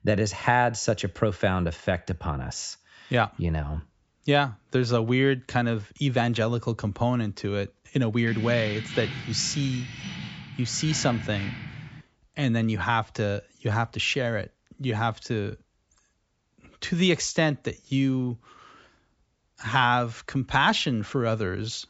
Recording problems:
high frequencies cut off; noticeable; nothing above 8 kHz
jangling keys; noticeable; from 8.5 to 12 s; peak 7 dB below the speech

